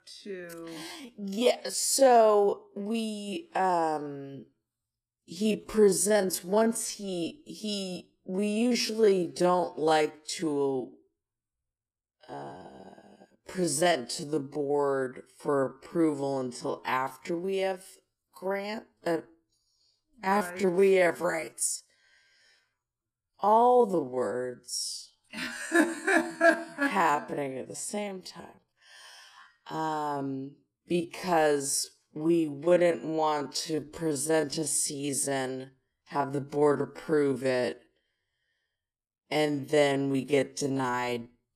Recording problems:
wrong speed, natural pitch; too slow; 0.5 times normal speed

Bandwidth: 14.5 kHz